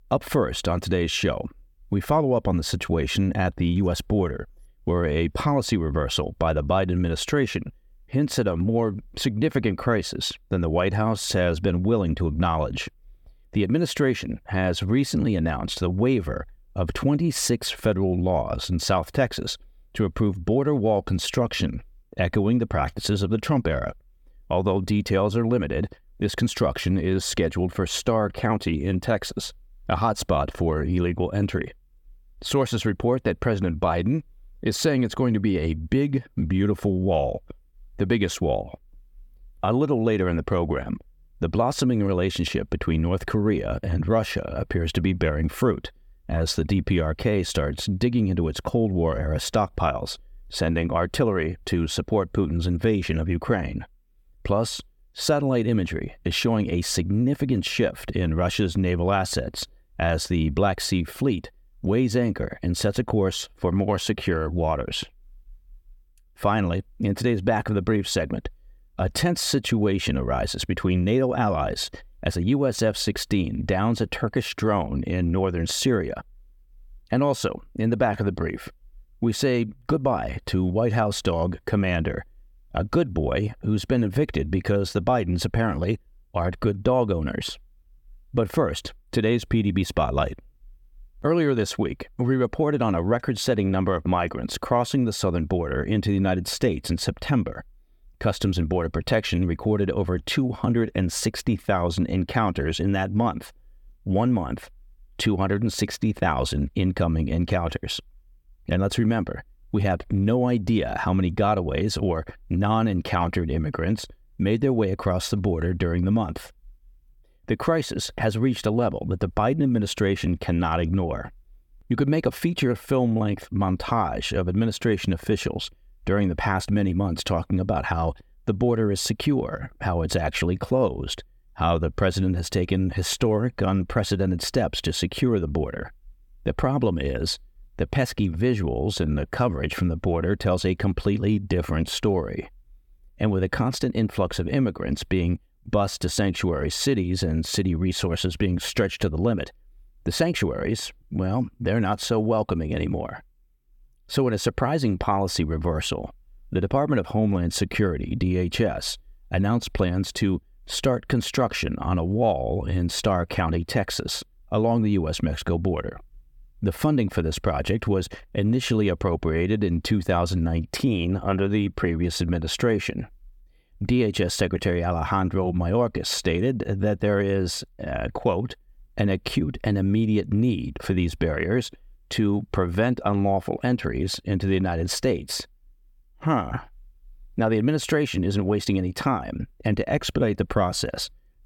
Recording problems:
none

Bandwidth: 18 kHz